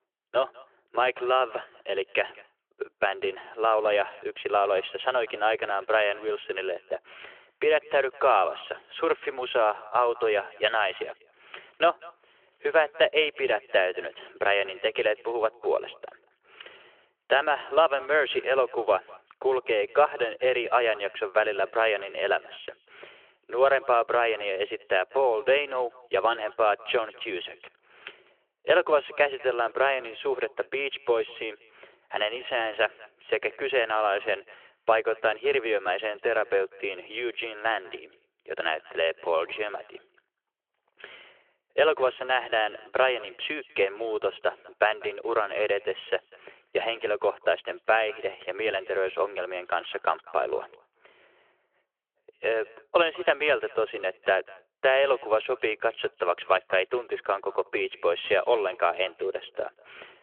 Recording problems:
thin; very; fading below 350 Hz
echo of what is said; faint; throughout; 200 ms later, 25 dB below the speech
phone-call audio

